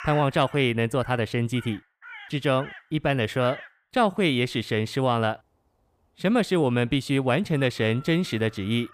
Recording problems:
animal sounds; noticeable; throughout; 20 dB below the speech

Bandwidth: 15 kHz